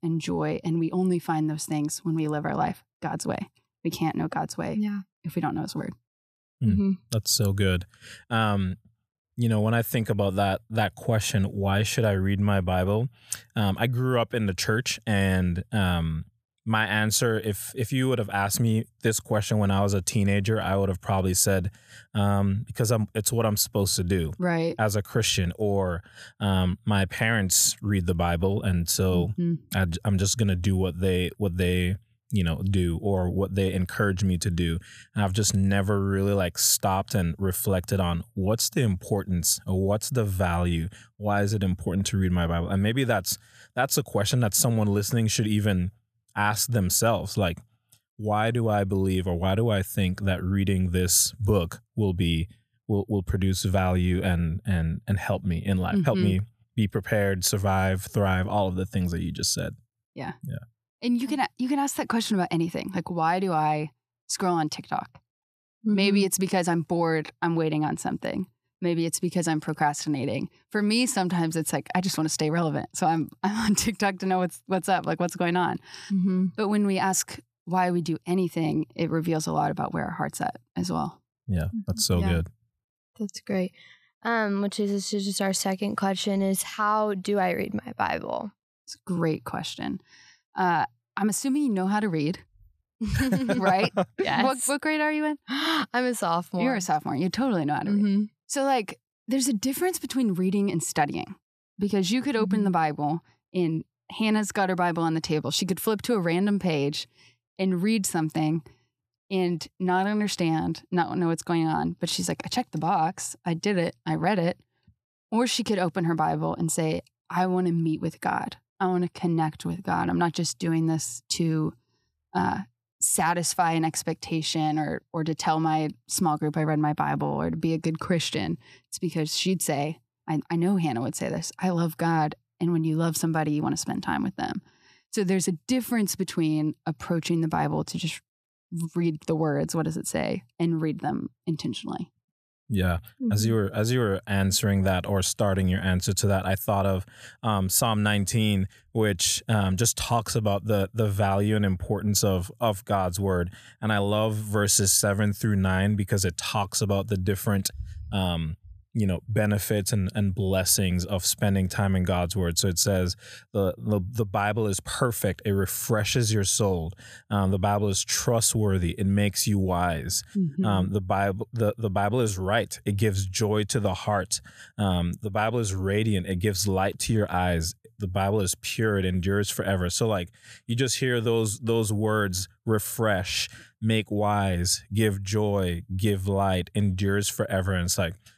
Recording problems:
none

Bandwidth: 14.5 kHz